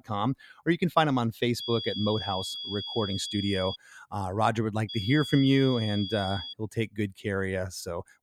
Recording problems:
high-pitched whine; loud; from 1.5 to 4 s and from 5 to 6.5 s; 3.5 kHz, 6 dB below the speech

